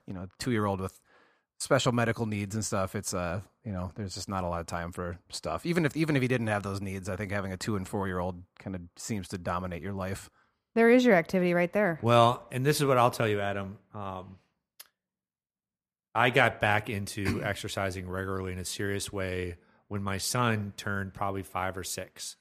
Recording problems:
none

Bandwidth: 14.5 kHz